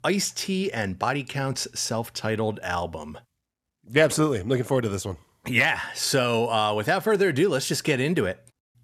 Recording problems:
none

